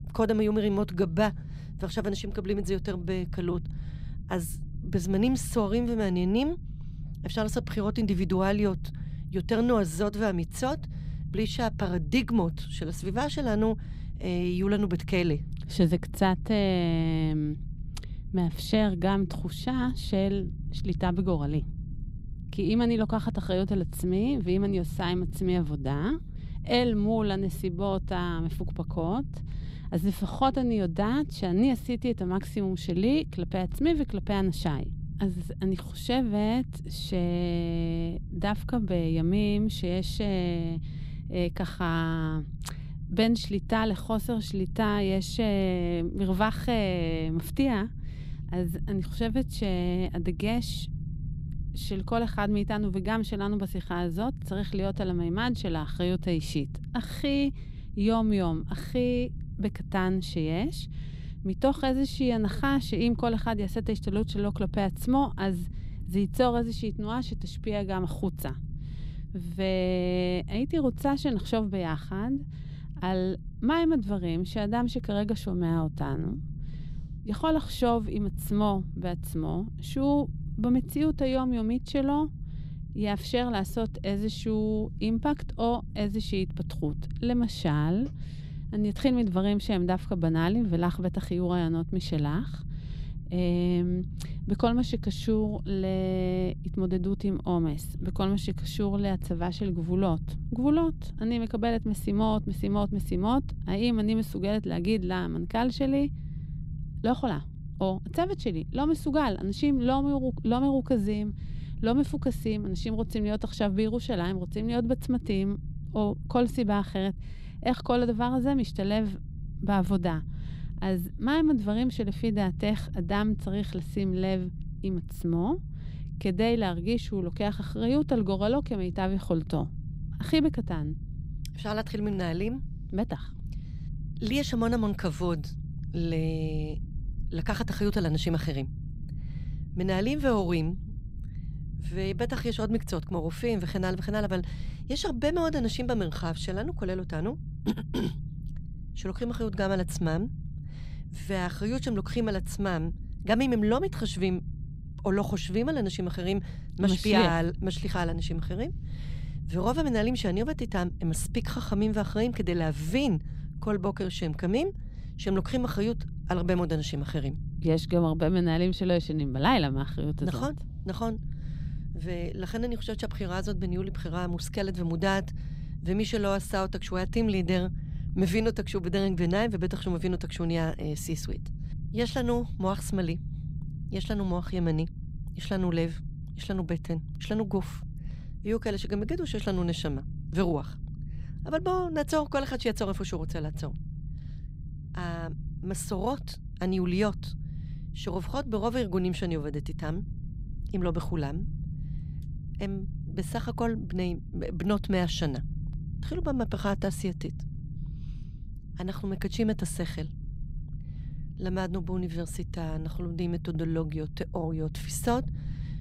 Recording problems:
low rumble; noticeable; throughout; 20 dB below the speech

